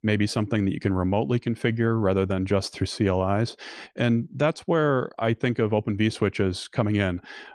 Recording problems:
garbled, watery; slightly

